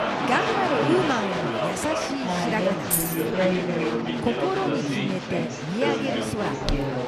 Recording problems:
chatter from many people; very loud; throughout; 2 dB above the speech
jangling keys; loud; at 3 s; peak 4 dB above the speech
dog barking; faint; at 4 s; peak 15 dB below the speech
footsteps; noticeable; at 6.5 s; peak 5 dB below the speech

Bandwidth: 14.5 kHz